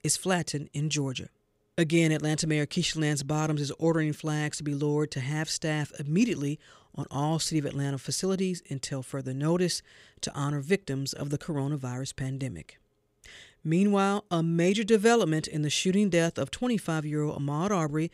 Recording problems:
none

